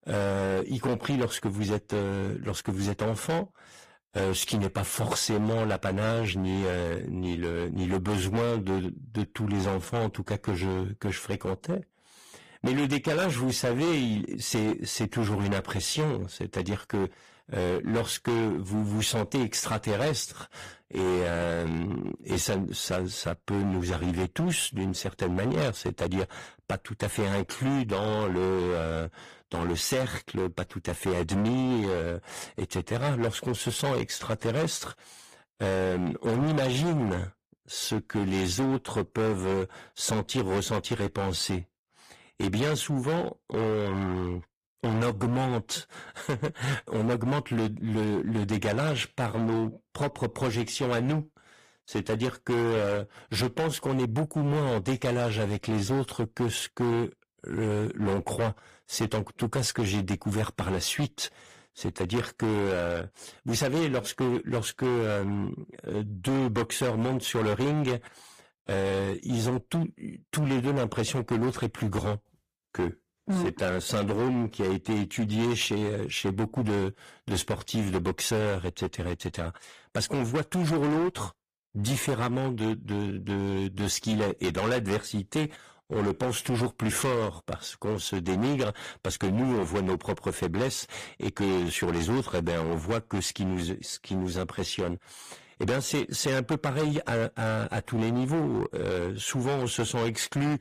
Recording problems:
distortion; heavy; 16% of the sound clipped
garbled, watery; slightly; nothing above 14.5 kHz

